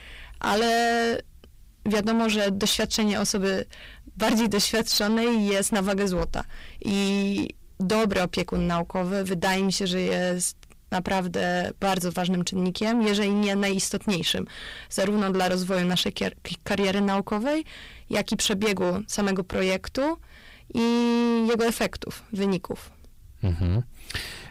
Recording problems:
distortion; heavy; 6 dB below the speech

